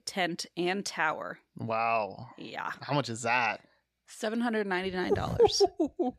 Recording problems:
none

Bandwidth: 14.5 kHz